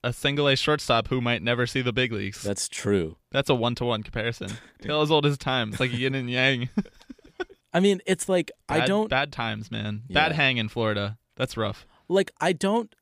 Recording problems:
none

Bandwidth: 15 kHz